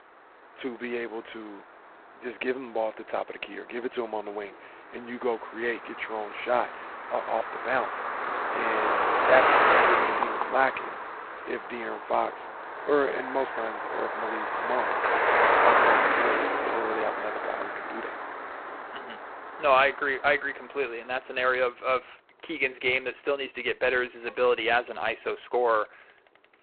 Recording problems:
phone-call audio; poor line; nothing above 4 kHz
traffic noise; very loud; throughout; 3 dB above the speech

